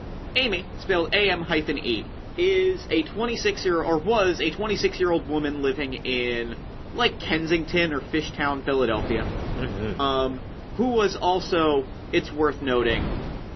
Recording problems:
garbled, watery; slightly; nothing above 6 kHz
wind noise on the microphone; occasional gusts; 15 dB below the speech

